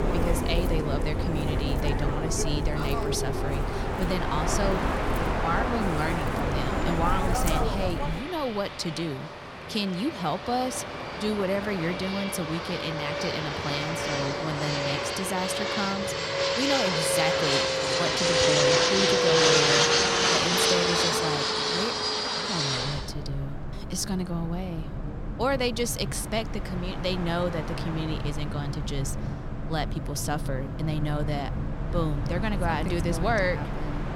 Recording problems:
train or aircraft noise; very loud; throughout; 4 dB above the speech

